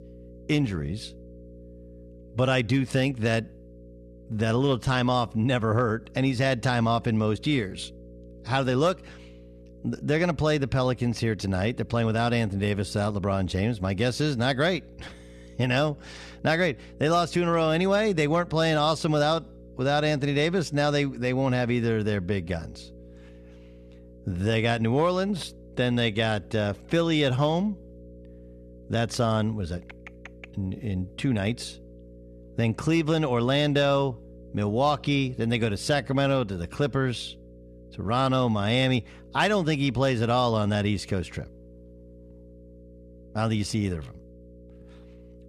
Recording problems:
electrical hum; faint; throughout; 60 Hz, 25 dB below the speech

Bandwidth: 13.5 kHz